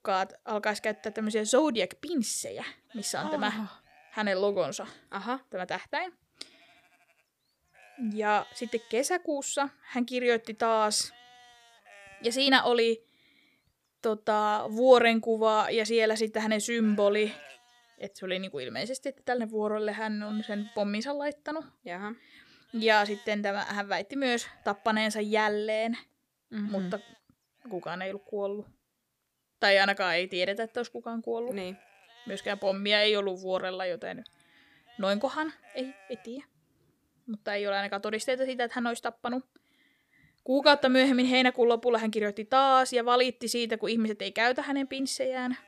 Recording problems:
animal sounds; faint; throughout; 25 dB below the speech

